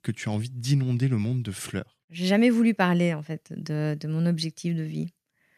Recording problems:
none

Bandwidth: 14.5 kHz